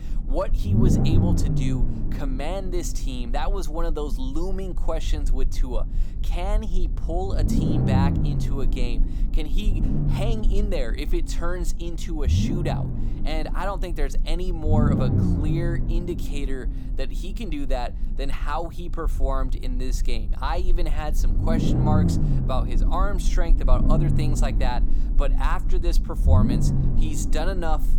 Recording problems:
low rumble; loud; throughout; 3 dB below the speech

